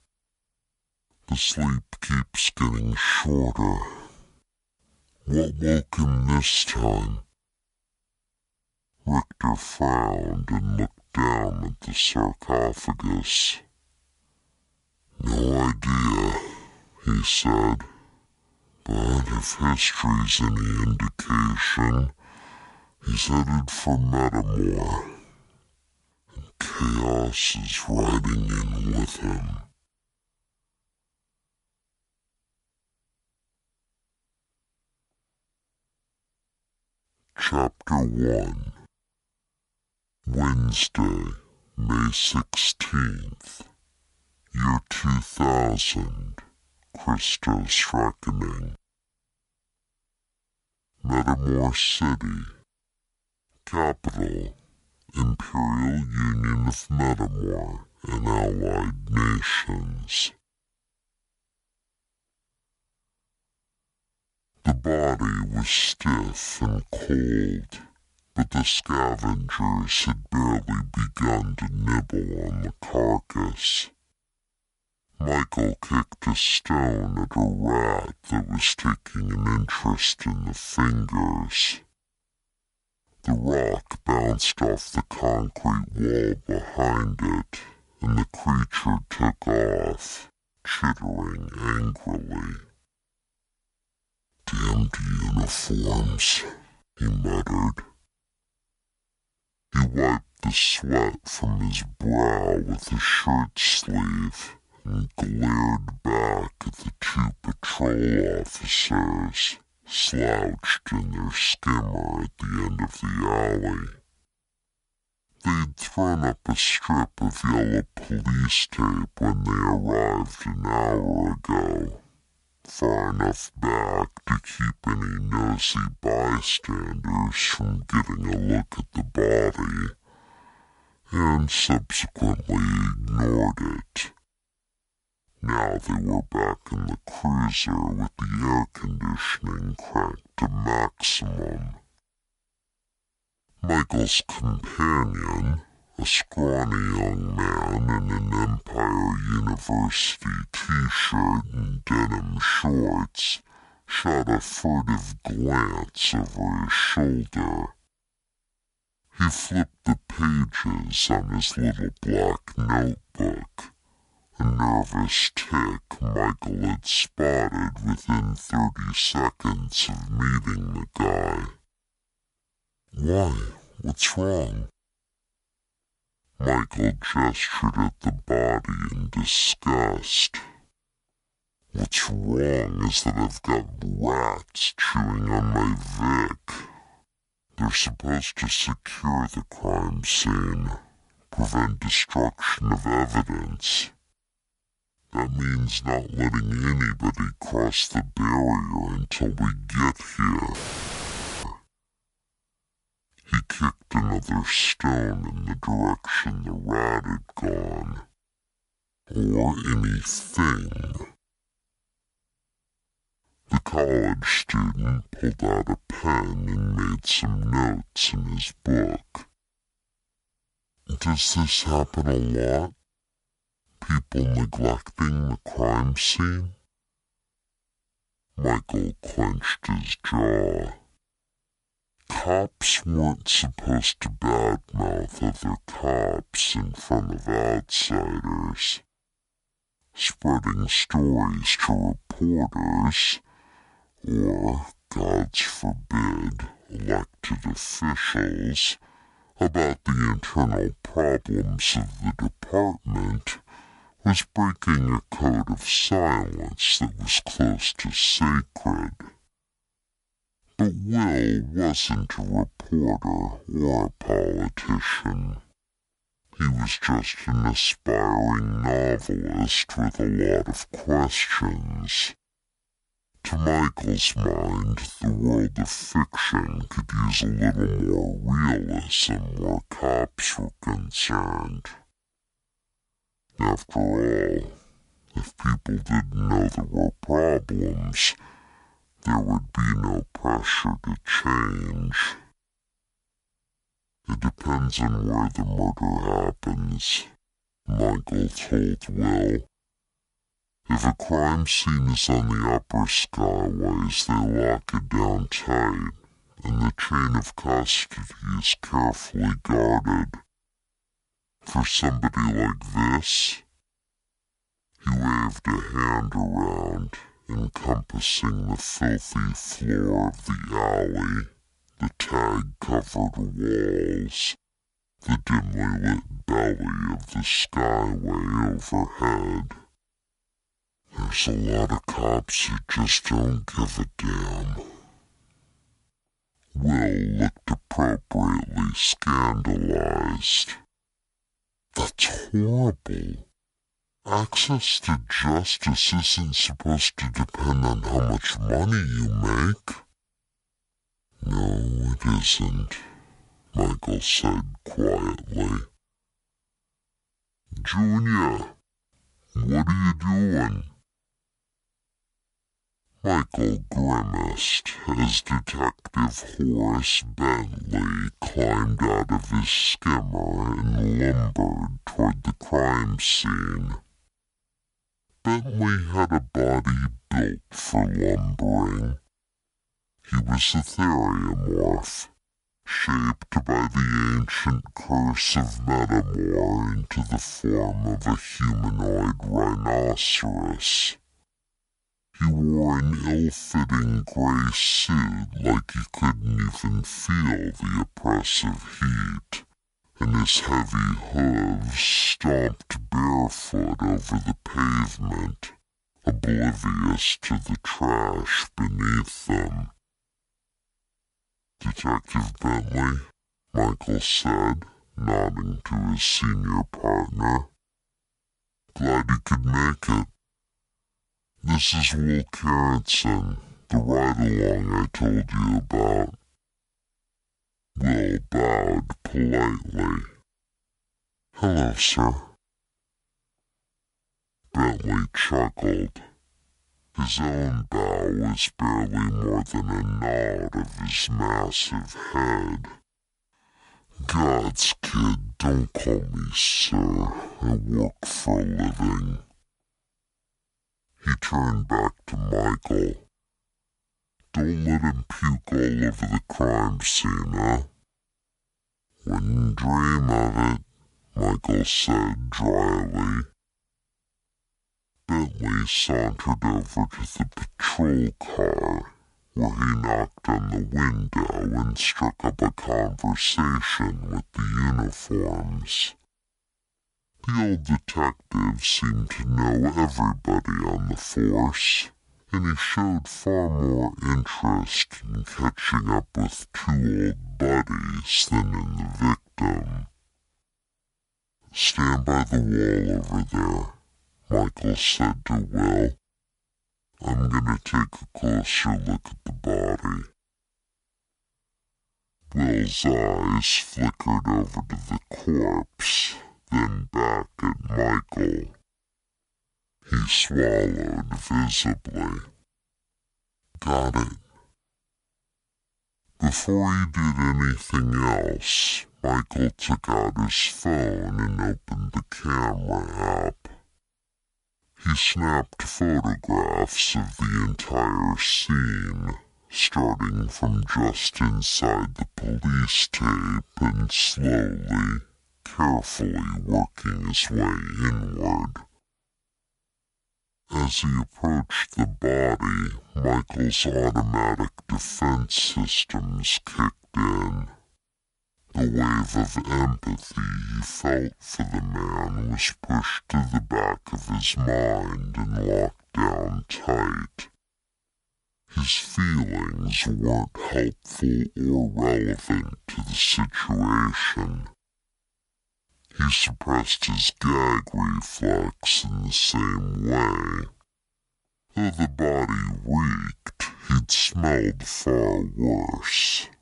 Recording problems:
wrong speed and pitch; too slow and too low; 0.6 times normal speed
audio cutting out; filled with static; at 3:21 for 1 s

